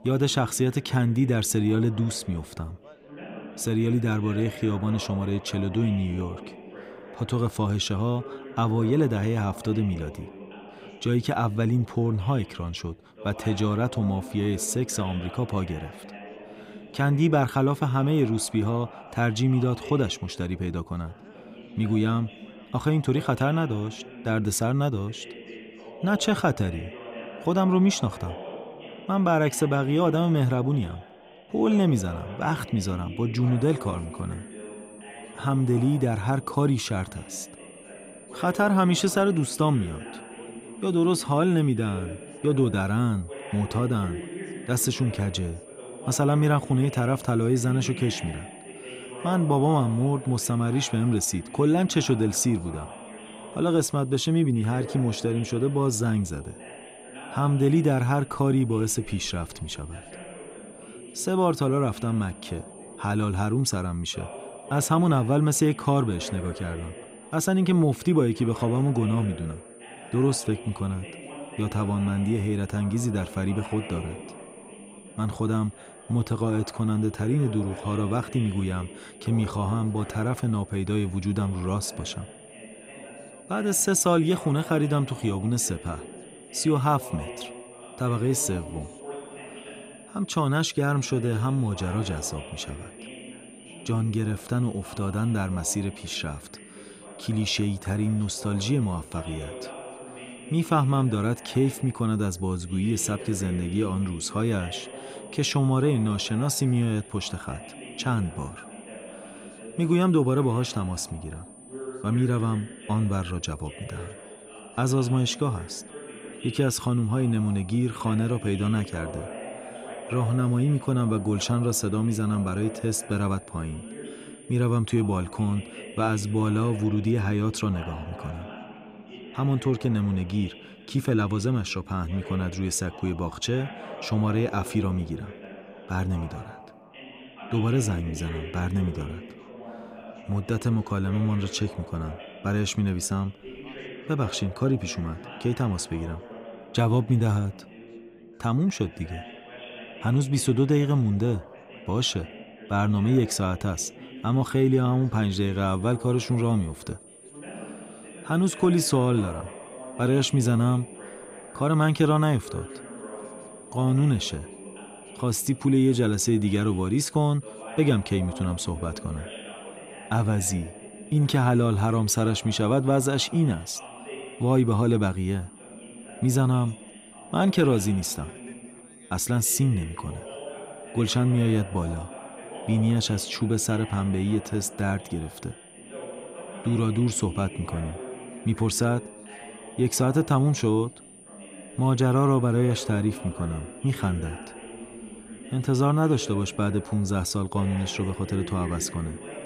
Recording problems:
background chatter; noticeable; throughout; 3 voices, 15 dB below the speech
high-pitched whine; faint; from 34 s to 2:07 and from 2:36 on; 9 kHz, 25 dB below the speech

